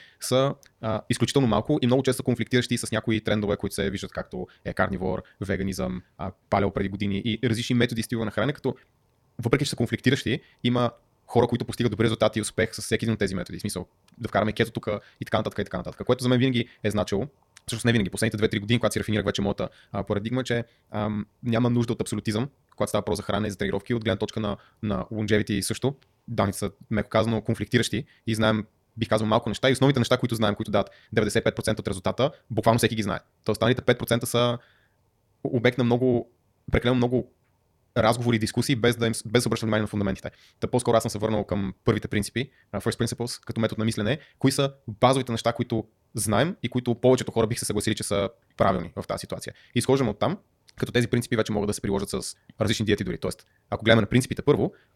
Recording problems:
wrong speed, natural pitch; too fast; 1.7 times normal speed

